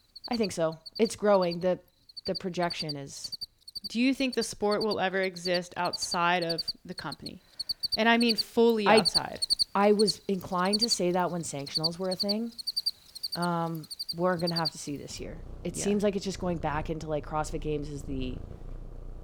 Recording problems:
animal sounds; loud; throughout; 4 dB below the speech

